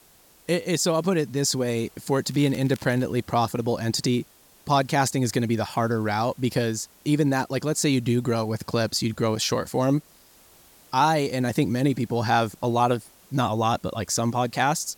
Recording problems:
hiss; faint; throughout; 30 dB below the speech
crackling; faint; at 2.5 s; 25 dB below the speech

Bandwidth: 17 kHz